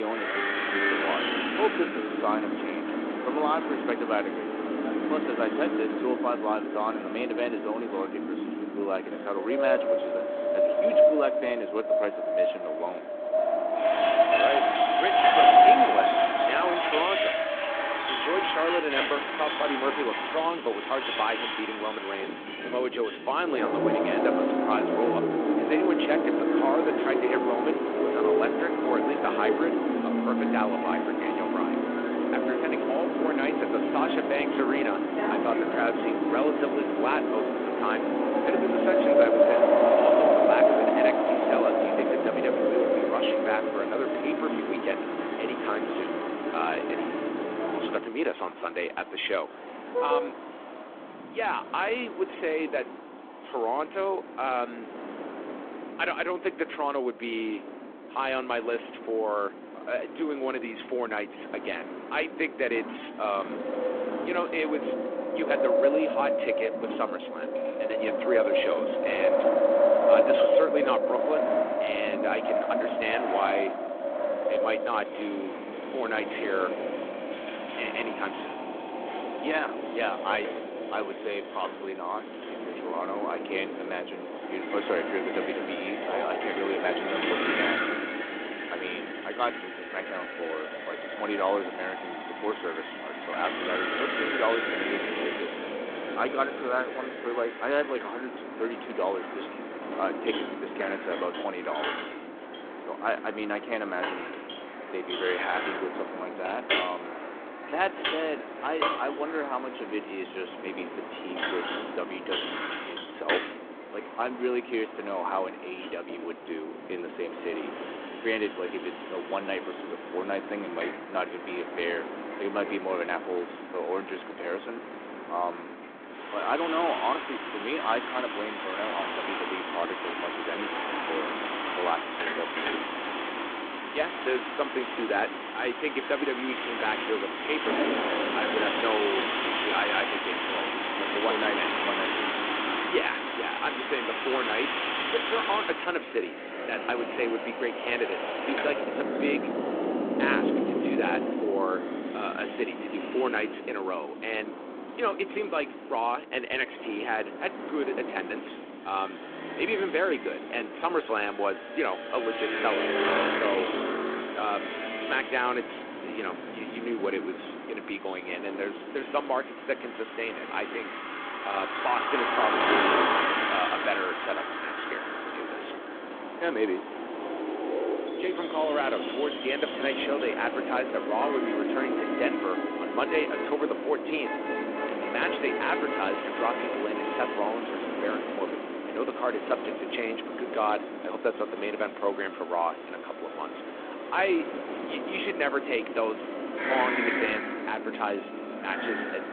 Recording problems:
phone-call audio
traffic noise; very loud; throughout; as loud as the speech
wind in the background; very loud; throughout; 1 dB above the speech
abrupt cut into speech; at the start

